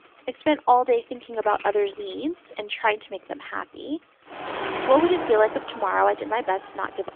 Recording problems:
phone-call audio; nothing above 3.5 kHz
traffic noise; loud; throughout; 9 dB below the speech

